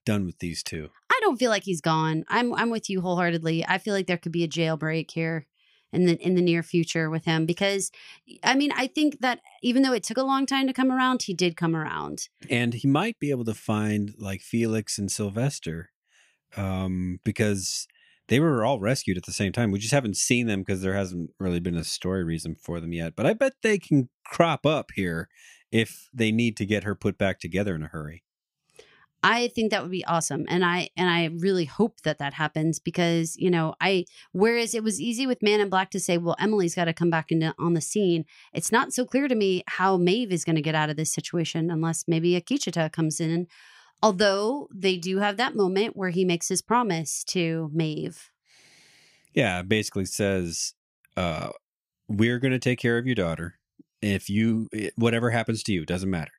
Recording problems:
uneven, jittery; strongly; from 1 to 55 s

